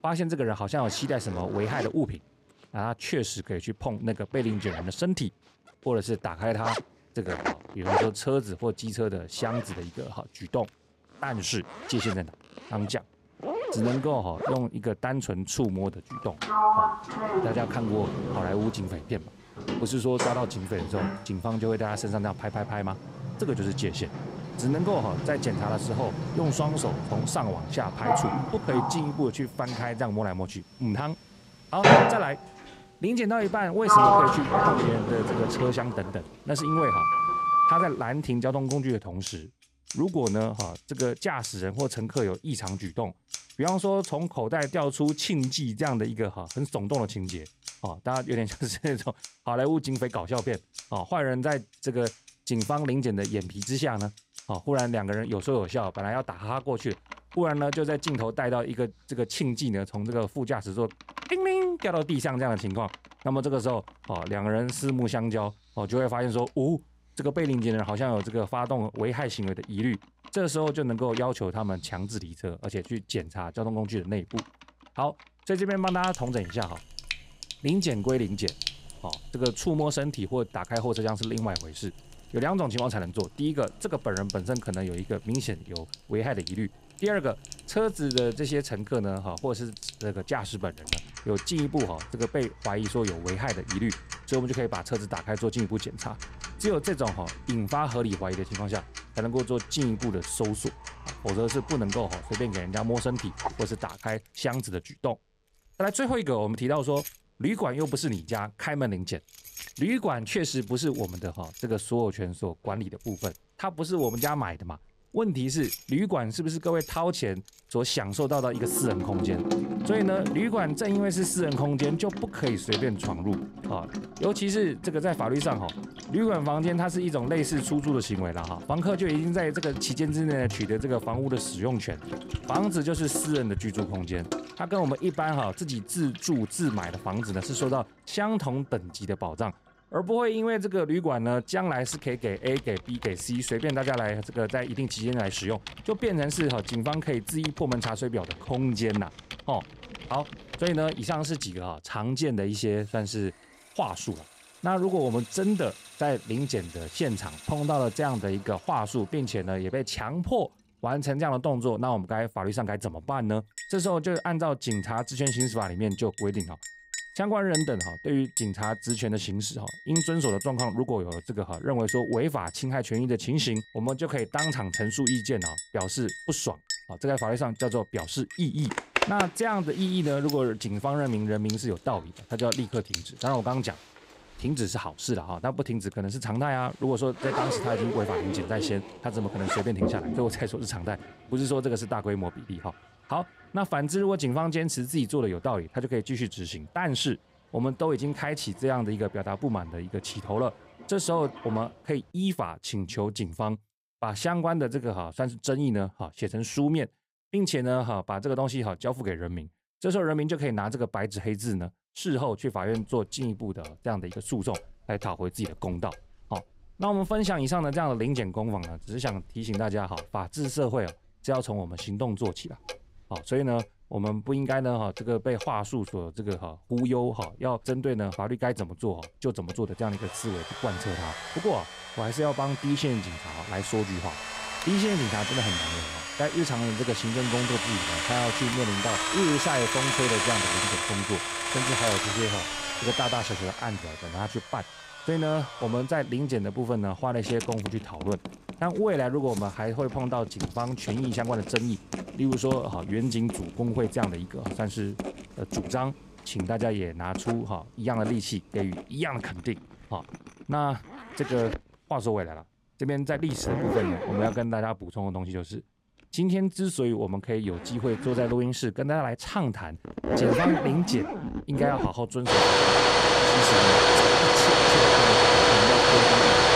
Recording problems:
household noises; very loud; throughout; as loud as the speech

